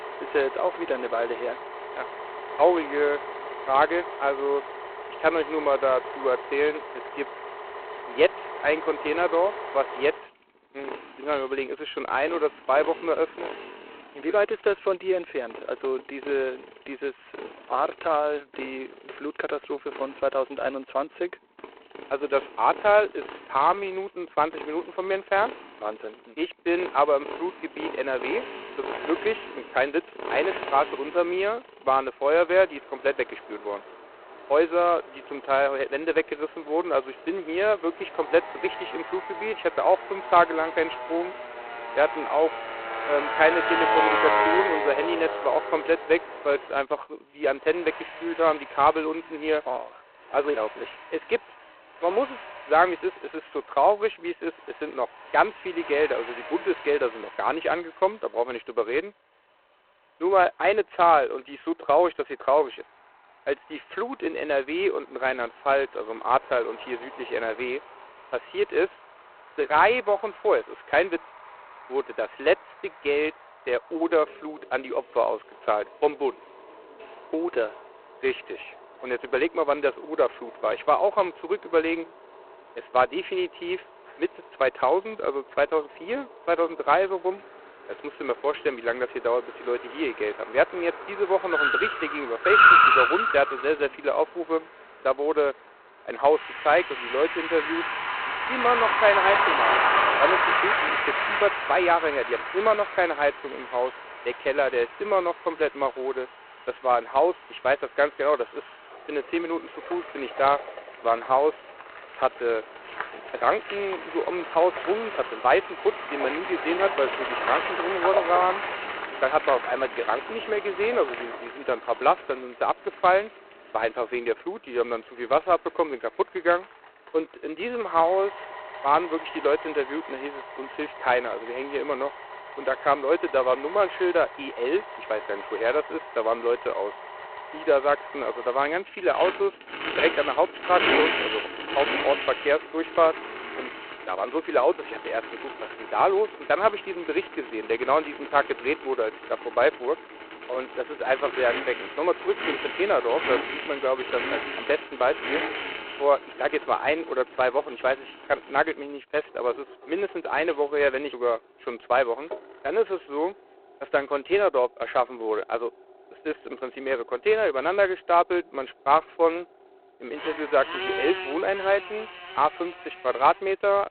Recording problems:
phone-call audio; poor line; nothing above 4 kHz
traffic noise; loud; throughout; 4 dB below the speech

